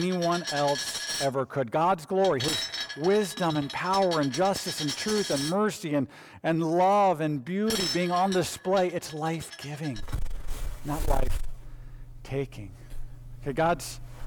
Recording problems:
distortion; slight; 10 dB below the speech
household noises; loud; throughout; 6 dB below the speech
abrupt cut into speech; at the start

